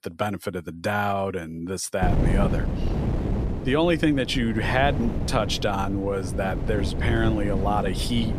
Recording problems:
wind noise on the microphone; heavy; from 2 s on; 9 dB below the speech

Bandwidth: 14.5 kHz